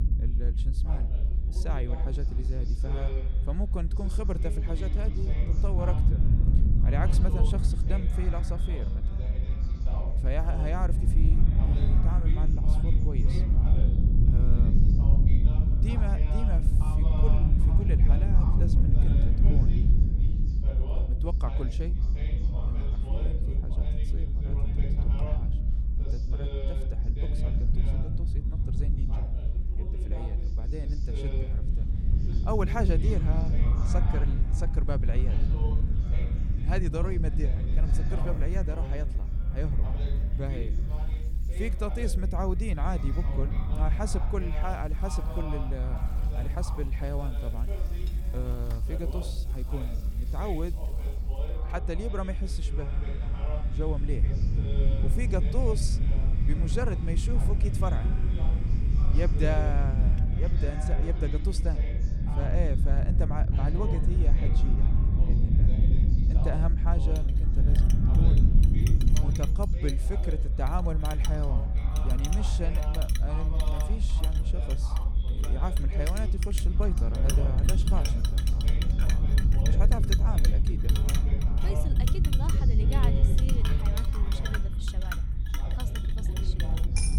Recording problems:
echo of what is said; noticeable; throughout; 560 ms later, 15 dB below the speech
household noises; loud; throughout; 7 dB below the speech
voice in the background; loud; throughout; 9 dB below the speech
low rumble; loud; throughout; 5 dB below the speech

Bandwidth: 17 kHz